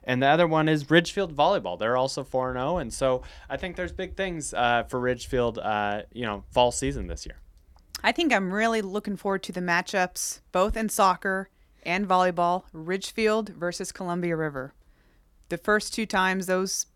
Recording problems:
none

